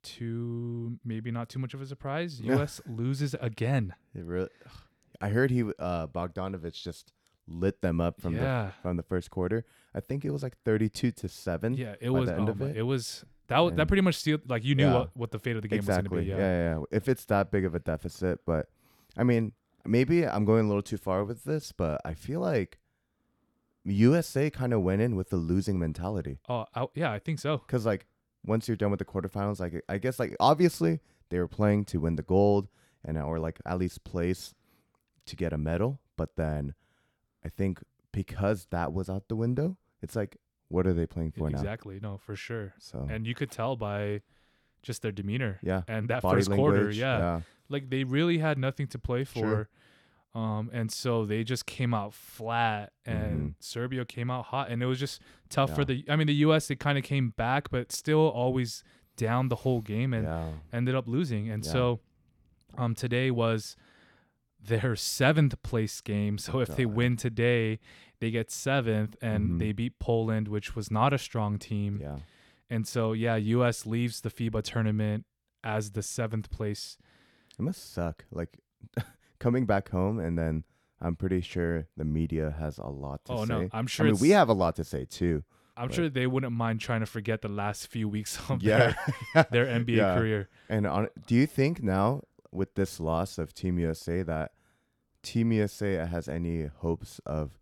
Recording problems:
none

